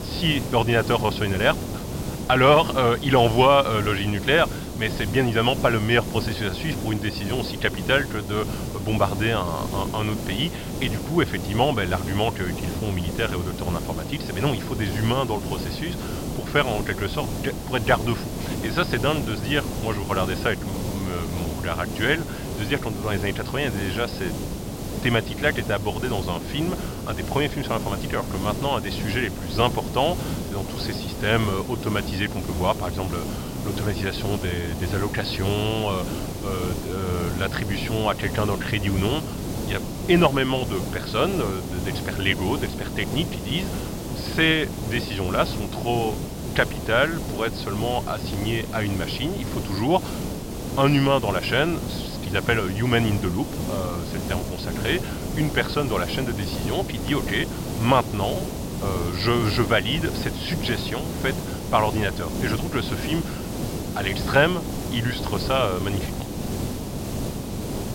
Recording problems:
high frequencies cut off; noticeable; nothing above 5.5 kHz
hiss; loud; throughout; 6 dB below the speech

